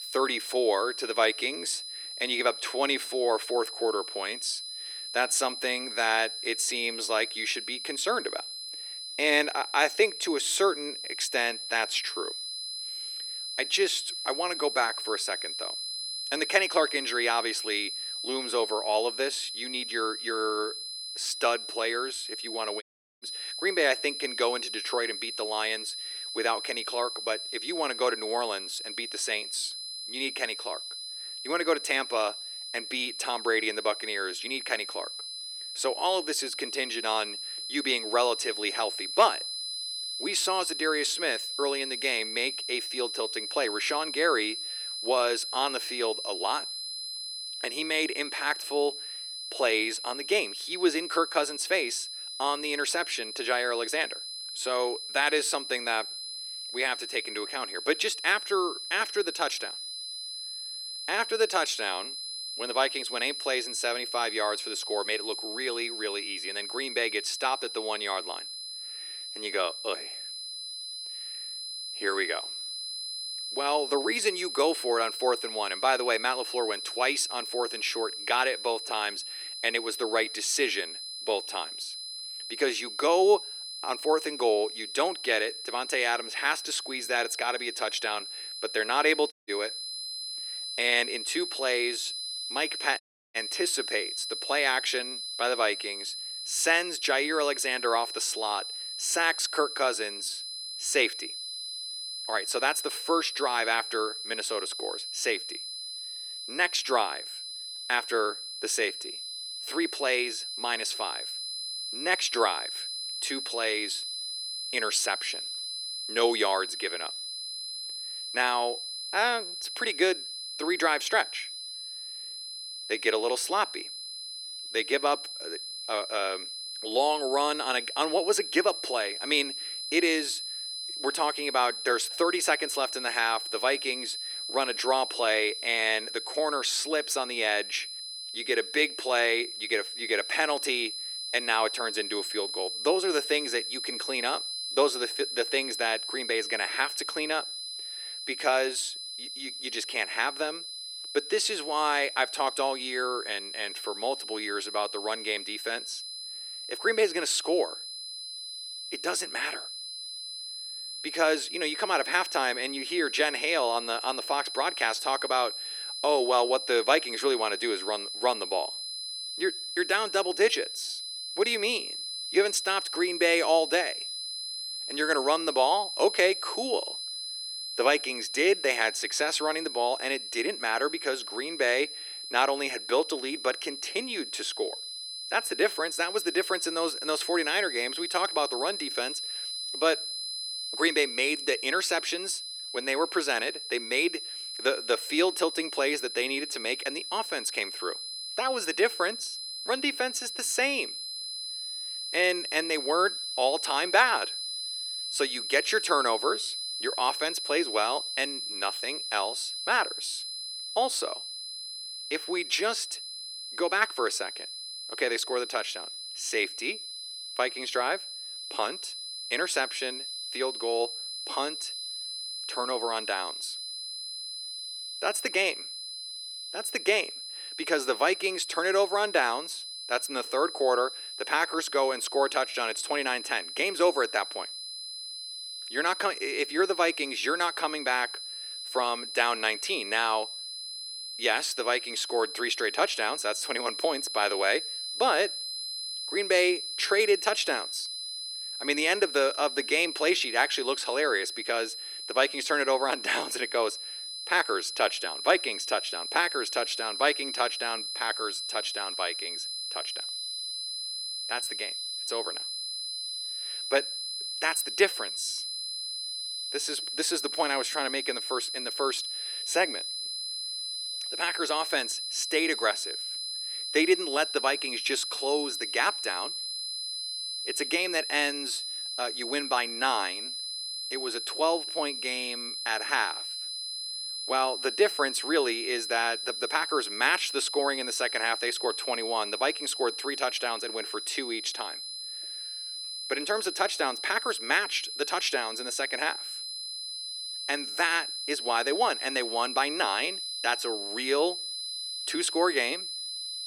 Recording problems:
thin; very; fading below 350 Hz
high-pitched whine; loud; throughout; 4 kHz, 5 dB below the speech
audio cutting out; at 23 s, at 1:29 and at 1:33

